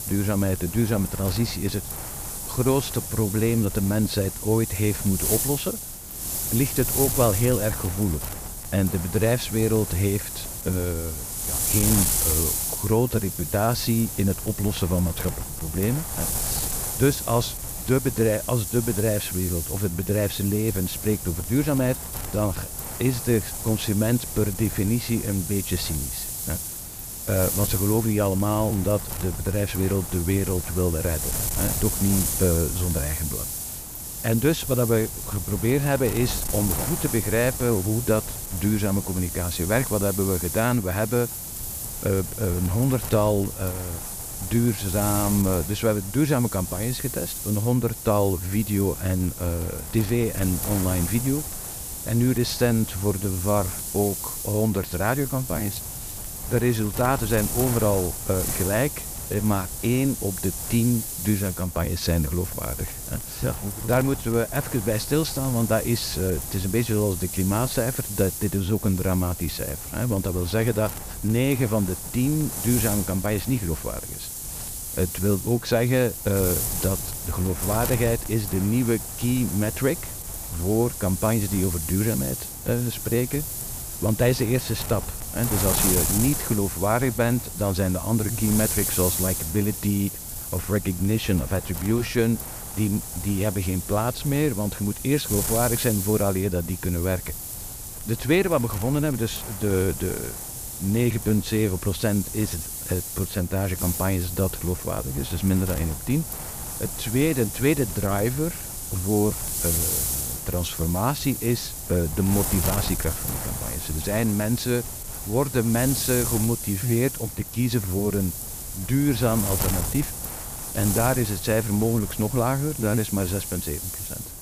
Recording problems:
wind noise on the microphone; heavy; 5 dB below the speech

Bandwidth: 15 kHz